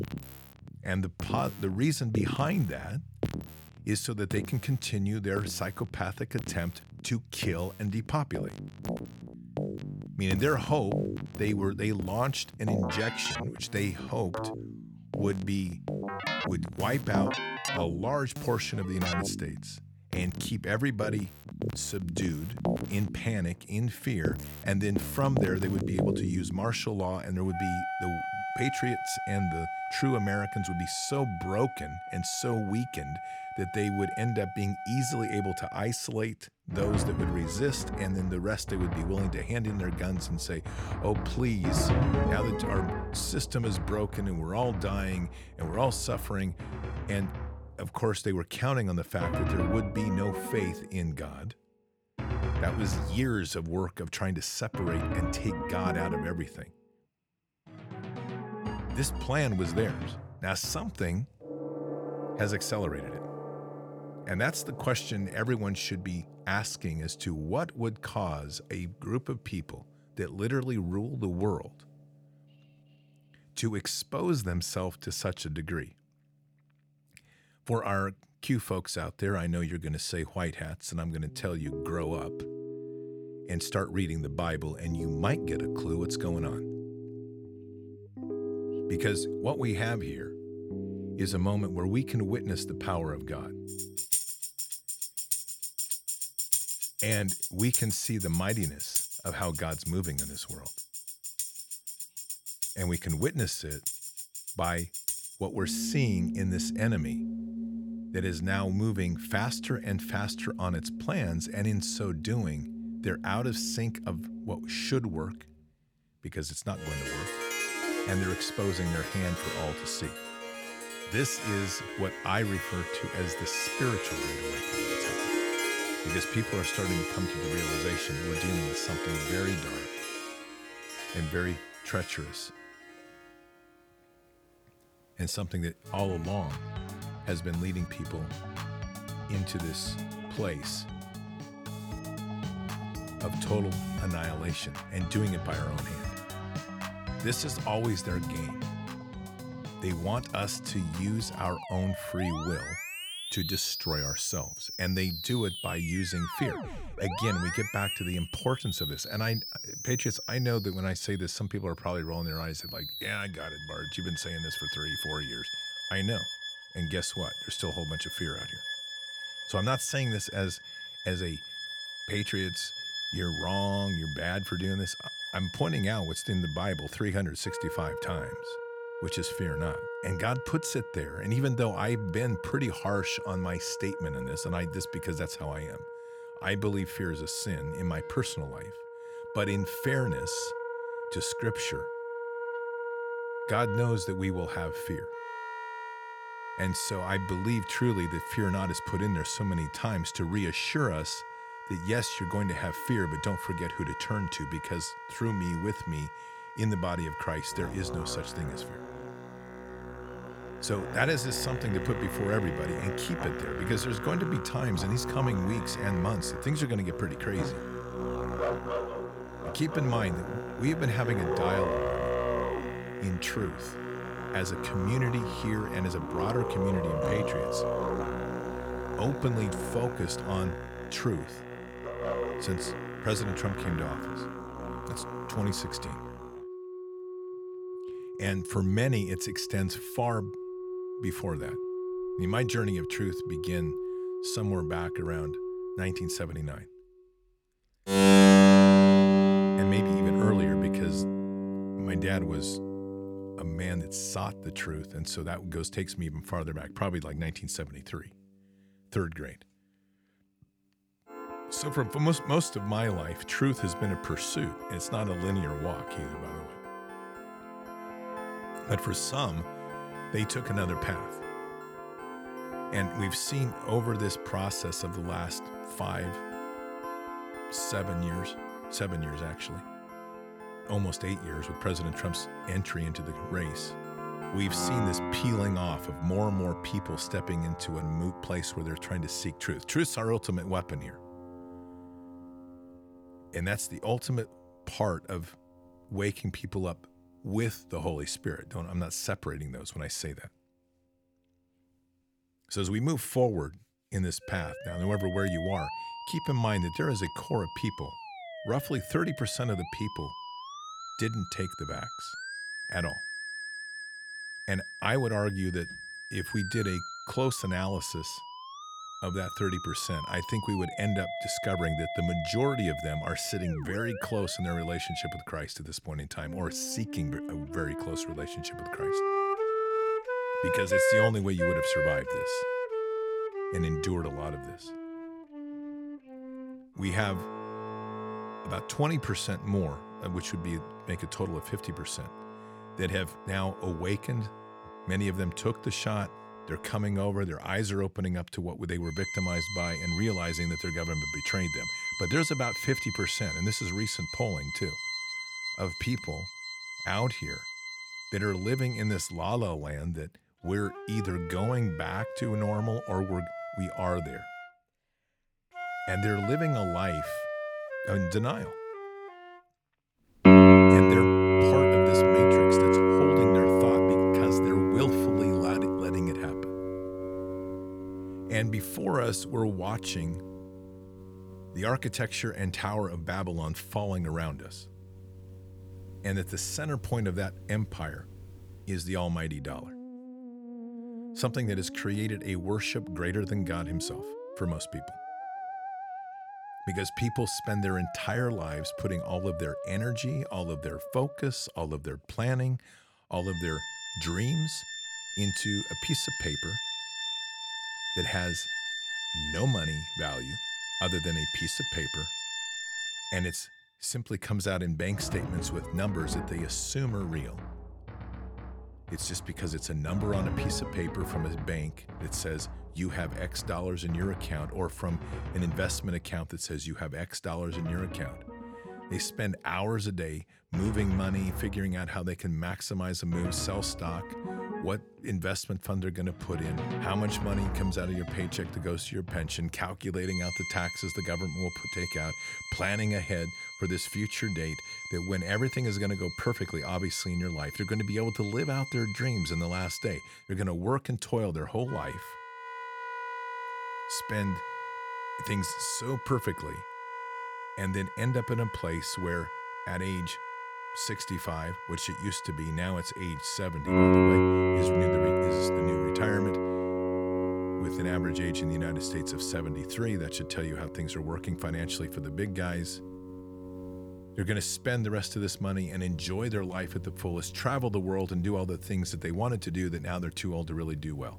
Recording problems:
background music; loud; throughout; as loud as the speech

